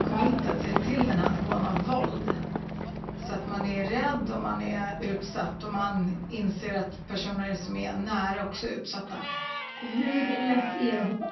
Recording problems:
off-mic speech; far
high frequencies cut off; noticeable; nothing above 6 kHz
room echo; slight; dies away in 0.6 s
animal sounds; loud; throughout; 5 dB below the speech
background music; loud; throughout; 7 dB below the speech

